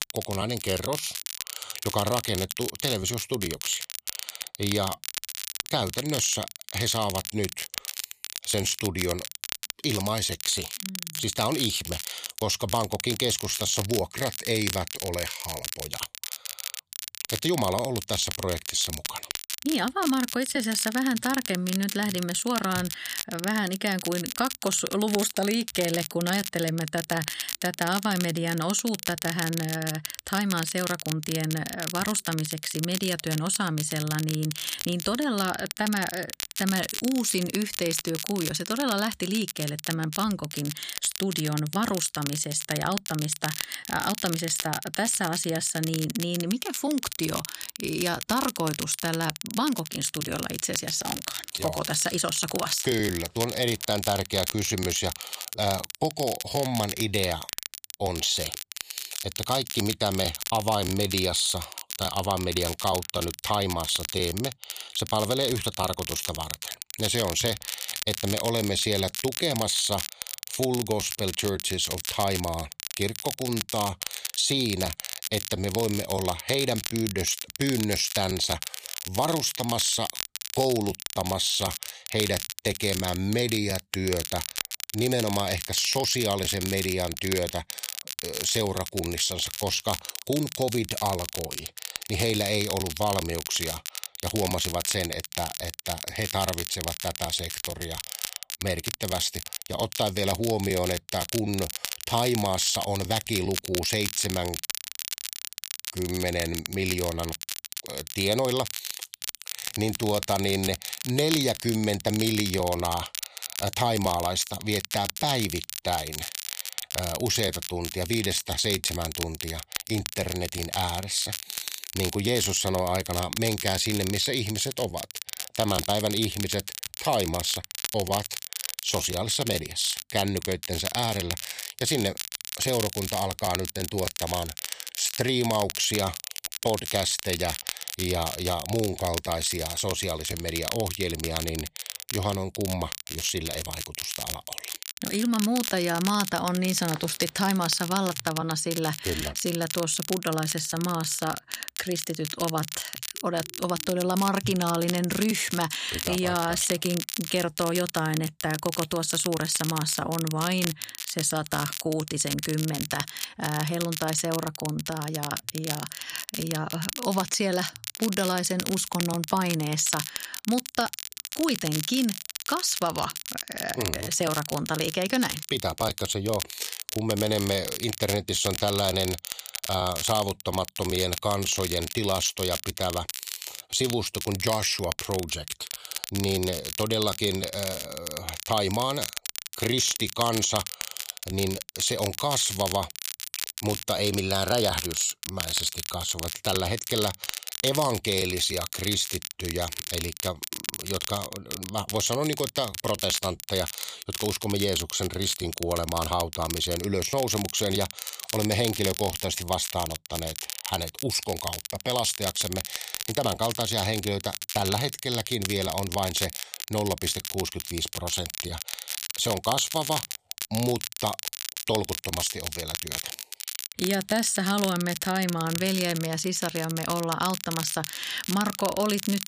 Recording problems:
crackle, like an old record; loud; 6 dB below the speech

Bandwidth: 15 kHz